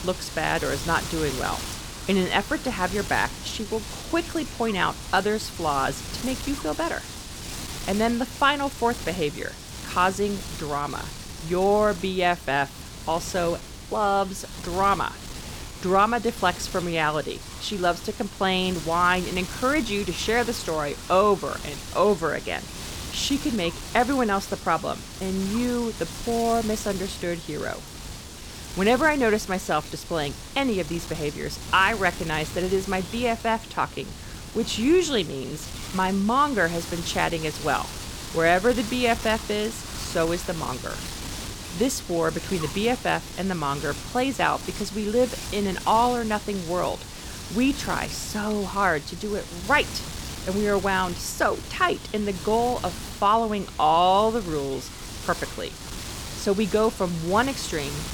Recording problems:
wind noise on the microphone; occasional gusts; 10 dB below the speech

